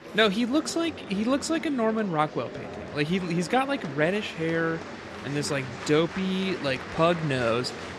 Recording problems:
murmuring crowd; noticeable; throughout; 10 dB below the speech

